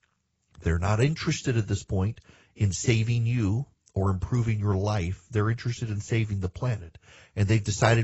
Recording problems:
garbled, watery; badly; nothing above 8 kHz
abrupt cut into speech; at the end

